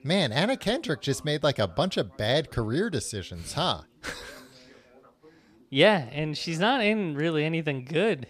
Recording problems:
background chatter; faint; throughout; 2 voices, 30 dB below the speech

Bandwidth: 14.5 kHz